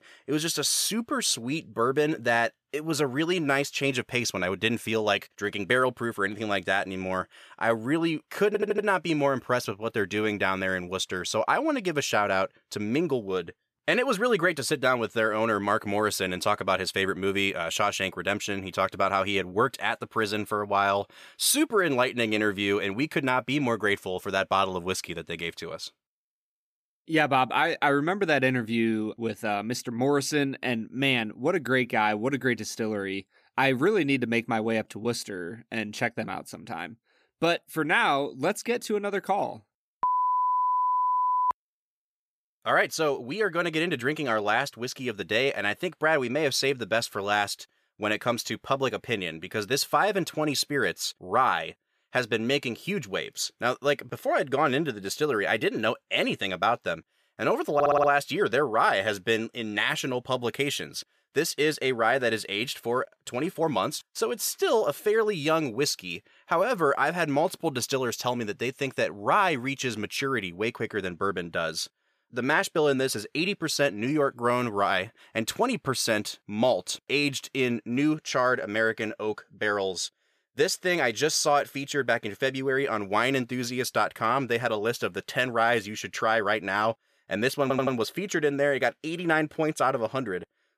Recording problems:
audio stuttering; at 8.5 s, at 58 s and at 1:28

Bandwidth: 14.5 kHz